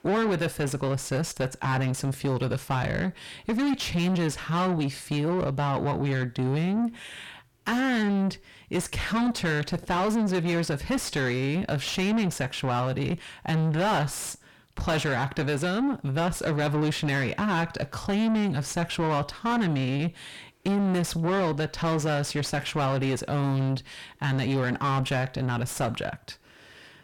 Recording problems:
distortion; heavy; 5 dB below the speech

